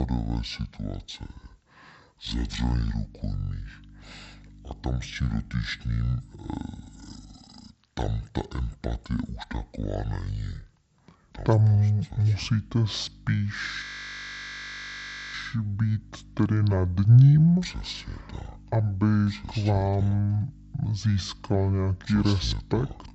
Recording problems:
wrong speed and pitch; too slow and too low; 0.6 times normal speed
electrical hum; faint; from 3 to 7.5 s and from 12 s on; 50 Hz, 25 dB below the speech
abrupt cut into speech; at the start
audio freezing; at 14 s for 1.5 s

